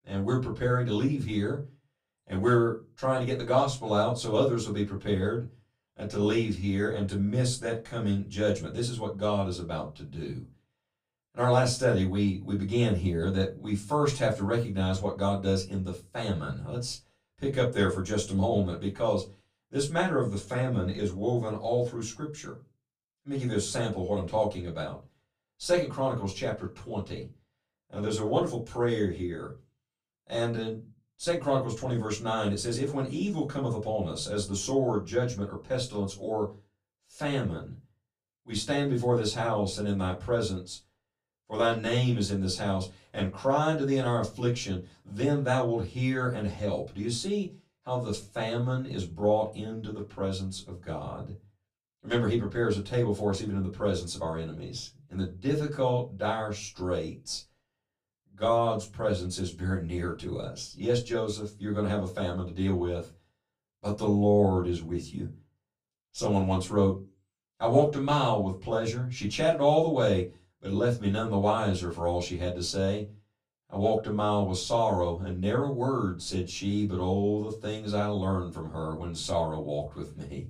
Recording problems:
off-mic speech; far
room echo; very slight; dies away in 0.2 s

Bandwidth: 15 kHz